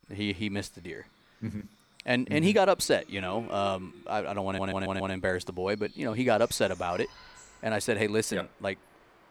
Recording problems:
animal sounds; faint; throughout; 25 dB below the speech
audio stuttering; at 4.5 s

